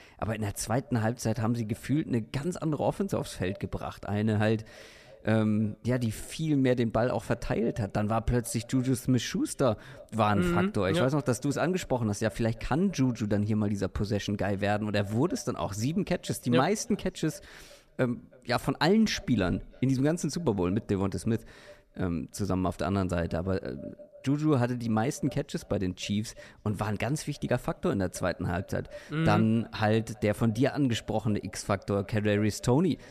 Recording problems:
echo of what is said; faint; throughout; 320 ms later, 25 dB below the speech

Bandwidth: 14.5 kHz